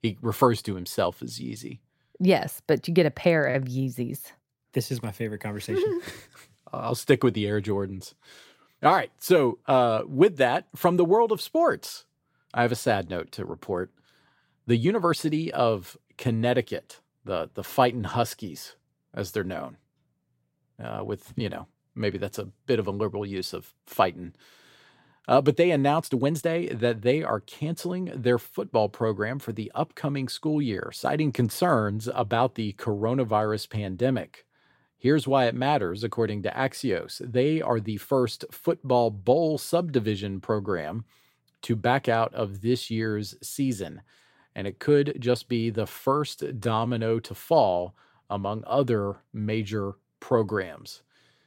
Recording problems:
uneven, jittery; slightly; from 15 to 47 s

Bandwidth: 16 kHz